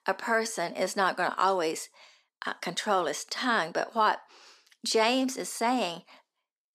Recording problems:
thin; somewhat; fading below 350 Hz

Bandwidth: 14.5 kHz